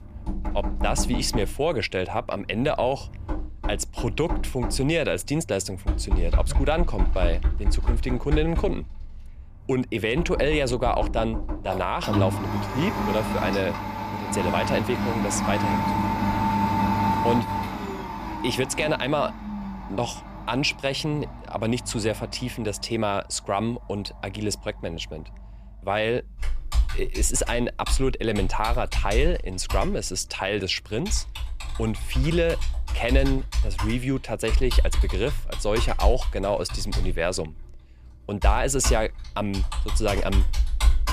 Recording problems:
household noises; loud; throughout; 2 dB below the speech

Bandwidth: 14.5 kHz